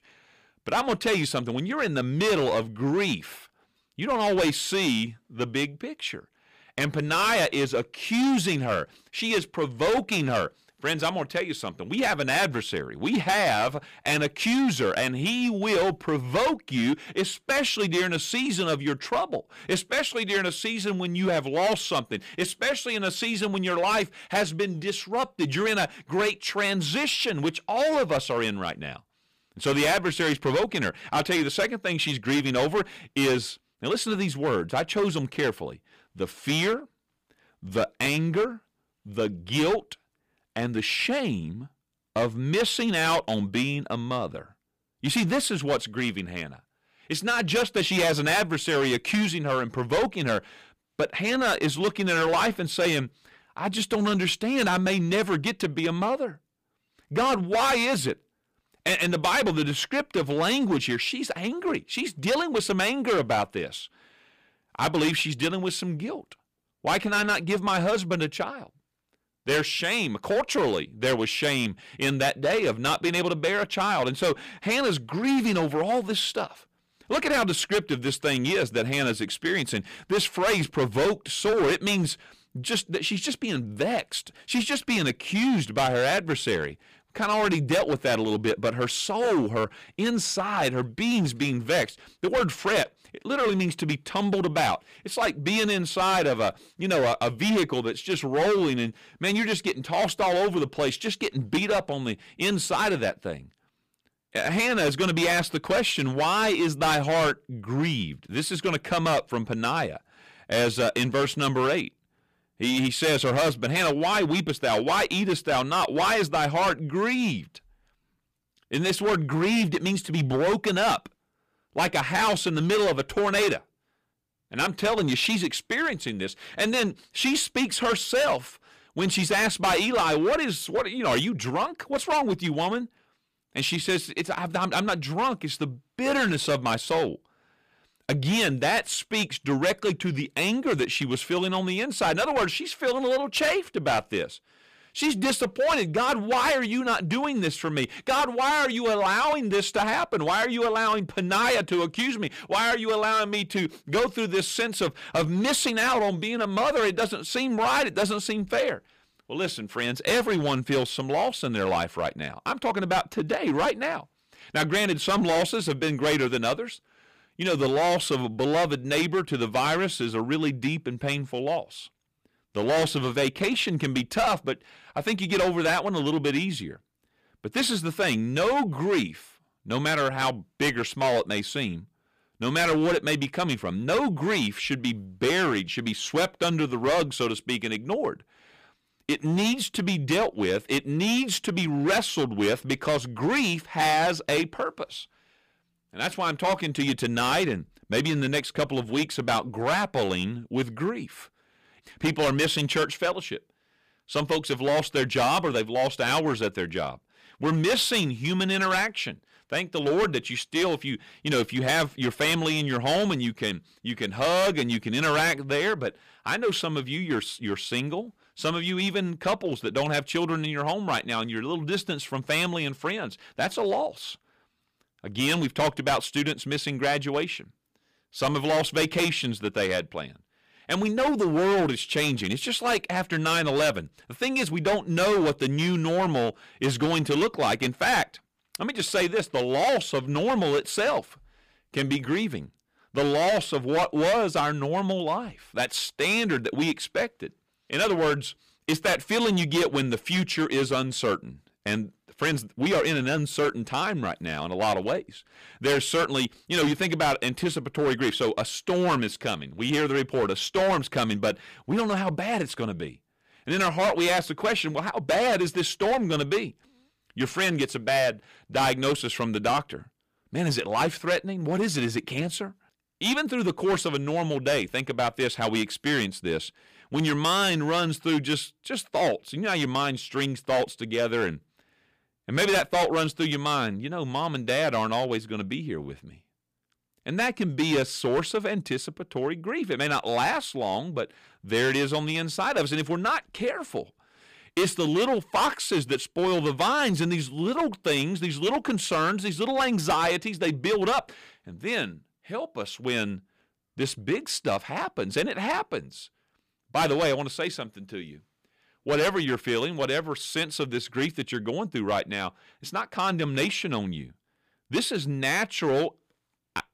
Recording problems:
distortion; heavy; 11% of the sound clipped

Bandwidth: 15 kHz